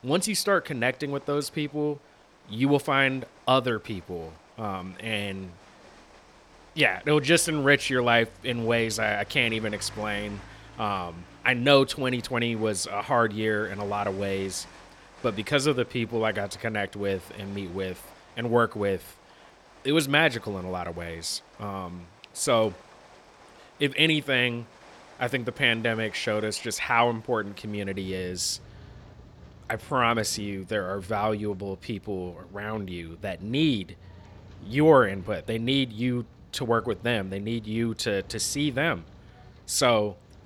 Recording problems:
rain or running water; faint; throughout; 25 dB below the speech

